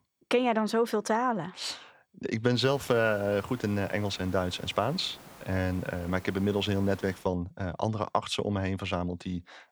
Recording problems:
hiss; noticeable; from 2.5 to 7 s; 20 dB below the speech

